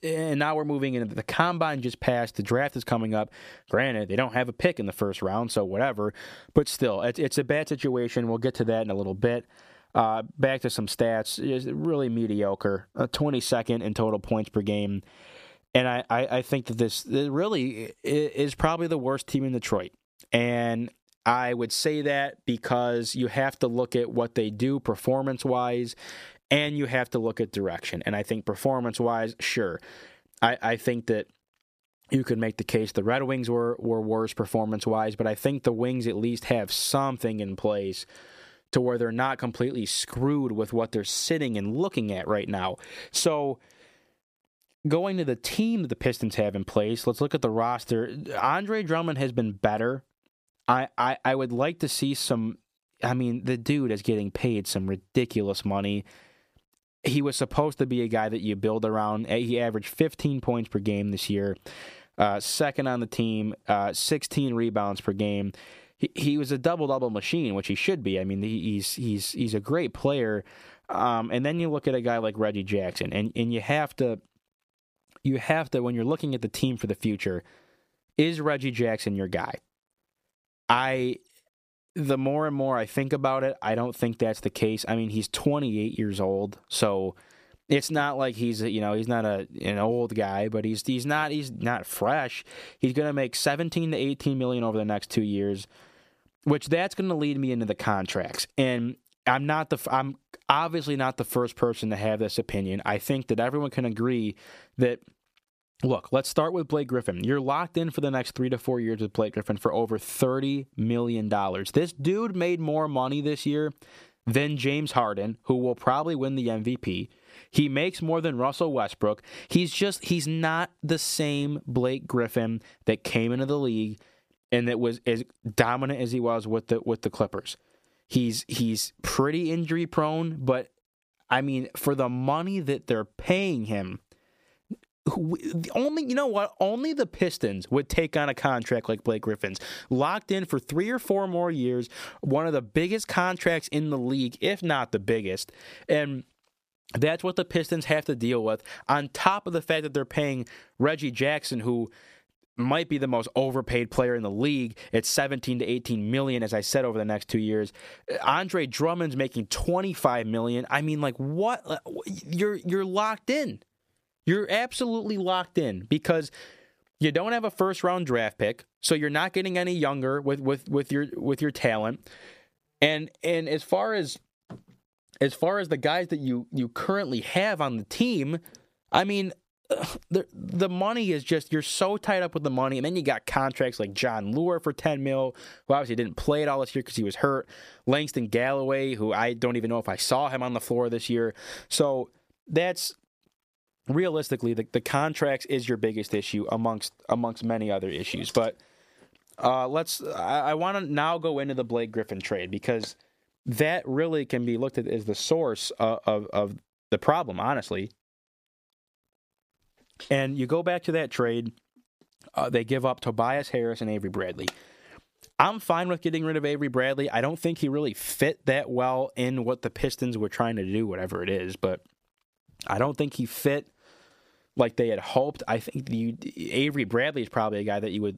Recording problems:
squashed, flat; somewhat

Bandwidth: 15 kHz